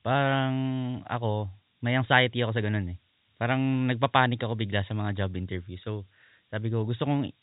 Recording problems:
high frequencies cut off; severe; nothing above 4 kHz
hiss; very faint; throughout; 40 dB below the speech

